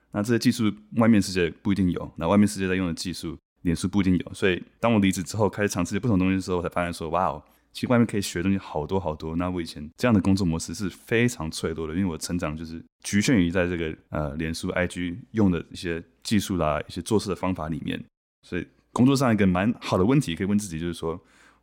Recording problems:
none

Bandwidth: 16.5 kHz